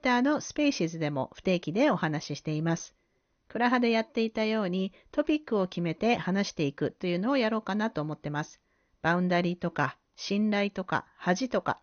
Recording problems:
garbled, watery; slightly; nothing above 6.5 kHz

